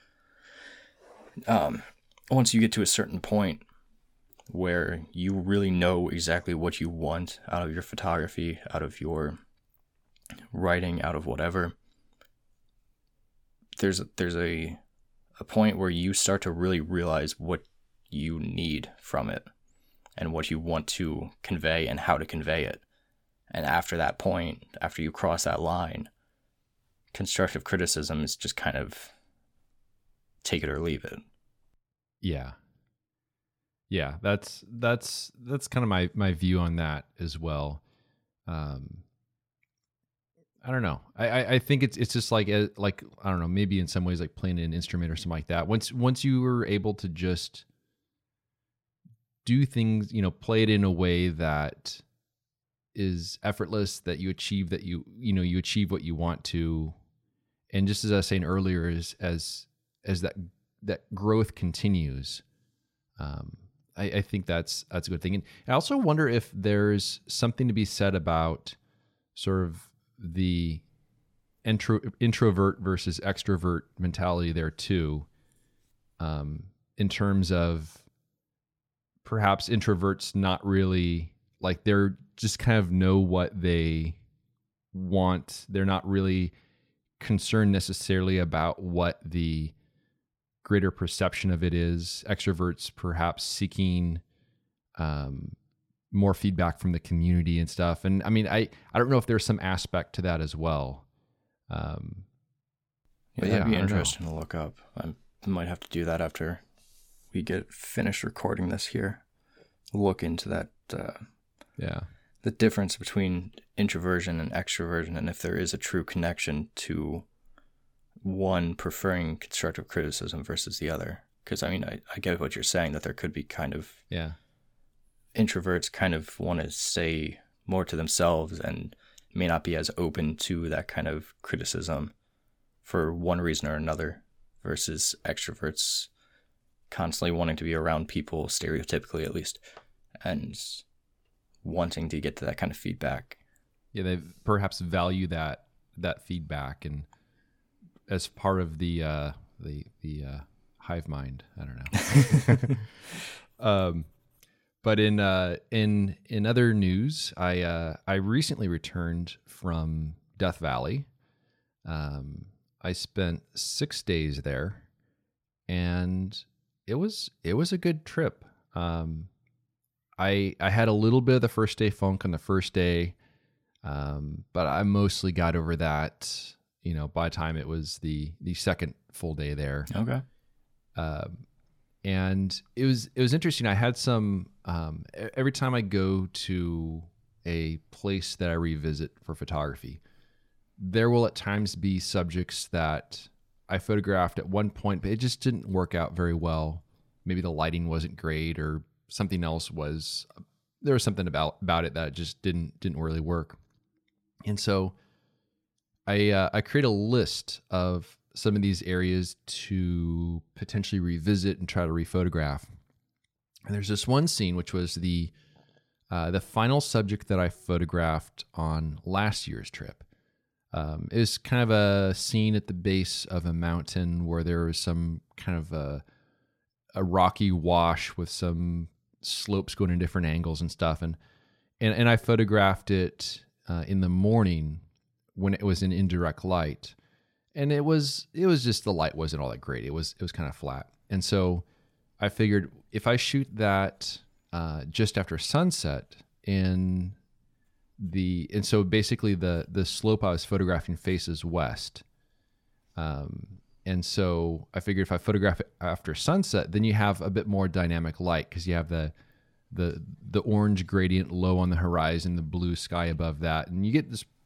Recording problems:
none

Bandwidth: 17.5 kHz